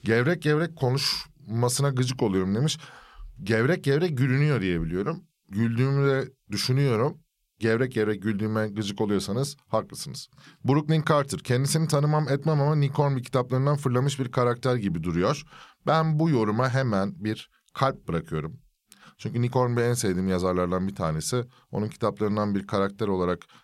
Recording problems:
none

